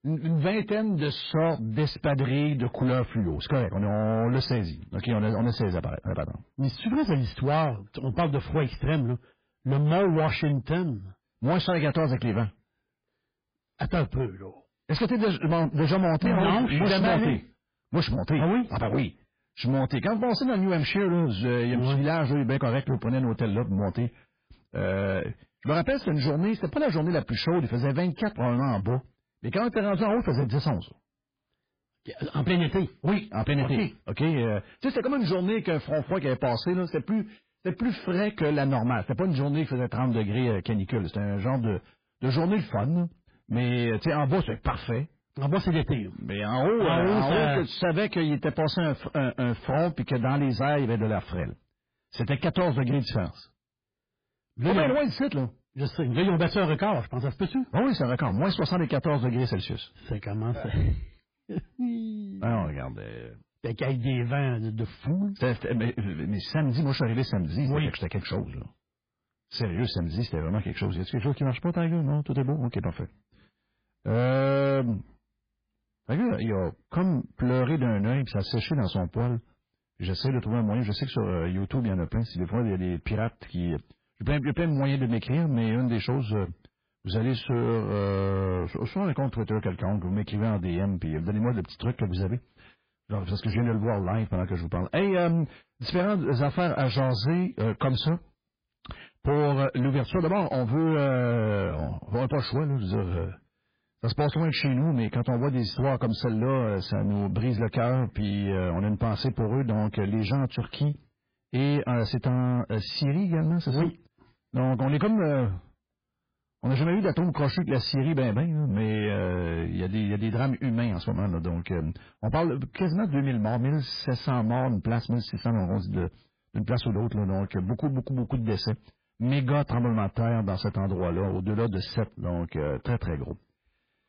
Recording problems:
garbled, watery; badly; nothing above 5 kHz
distortion; slight; 10 dB below the speech

